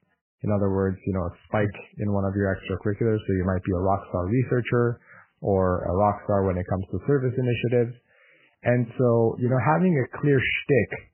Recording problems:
garbled, watery; badly; nothing above 3 kHz

